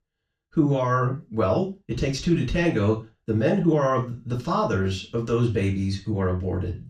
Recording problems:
off-mic speech; far
room echo; slight; dies away in 0.3 s

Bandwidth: 15 kHz